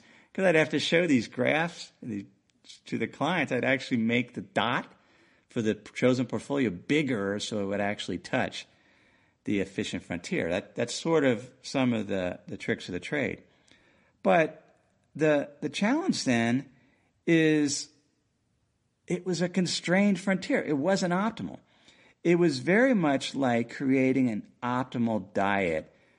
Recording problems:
garbled, watery; slightly; nothing above 9 kHz

